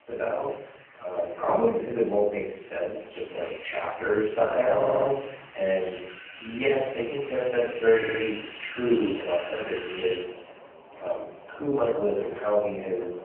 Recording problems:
phone-call audio; poor line
off-mic speech; far
room echo; noticeable; dies away in 0.6 s
traffic noise; noticeable; throughout; 15 dB below the speech
uneven, jittery; strongly; from 1 to 12 s
audio stuttering; at 5 s and at 8 s

